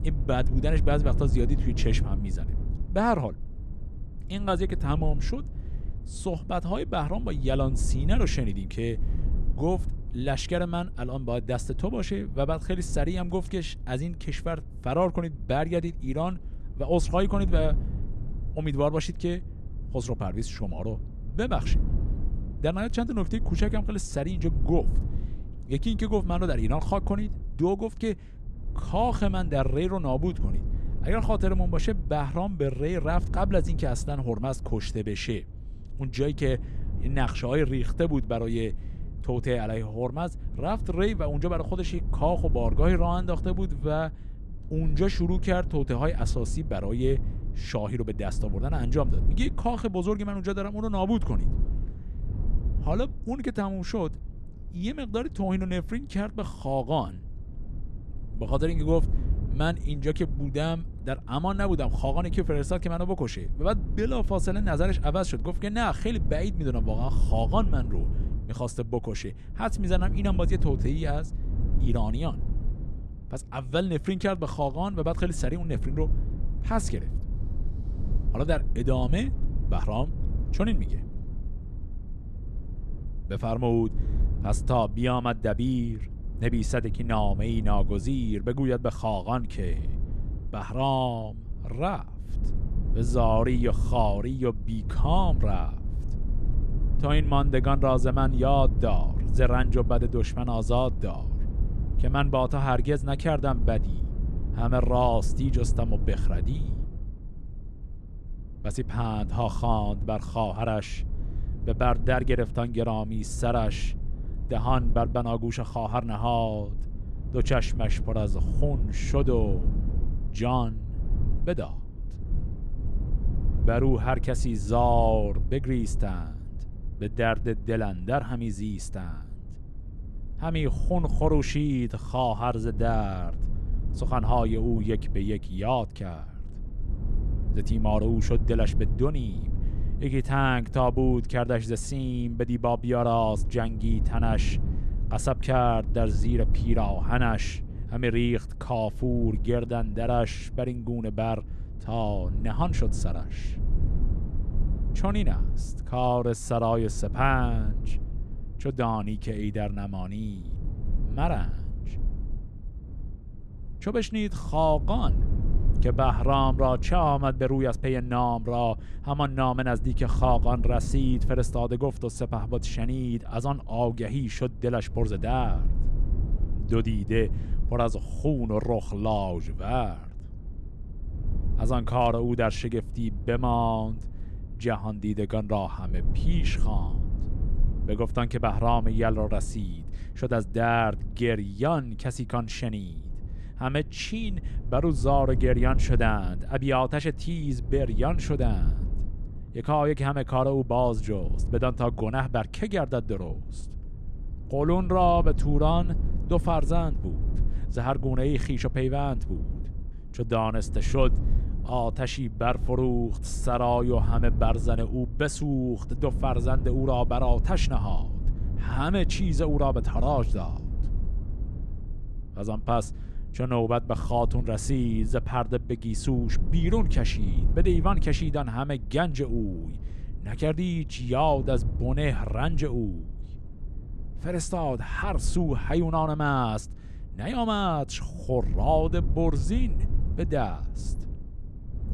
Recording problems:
low rumble; noticeable; throughout; 20 dB below the speech

